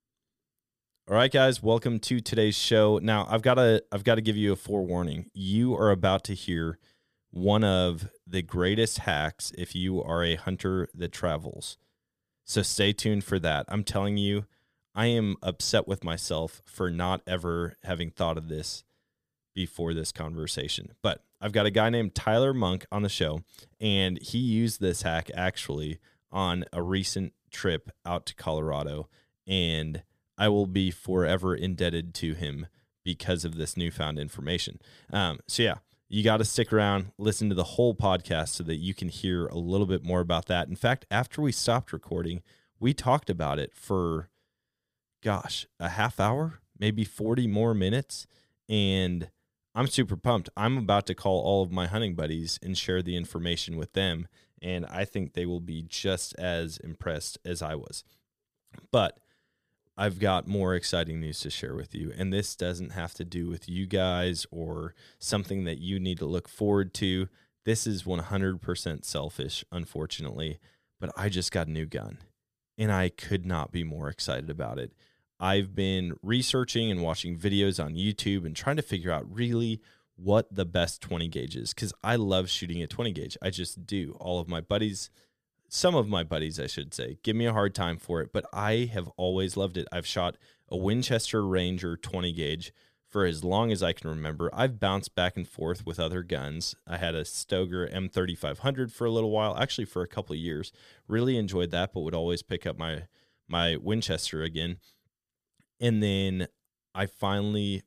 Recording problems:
none

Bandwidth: 15 kHz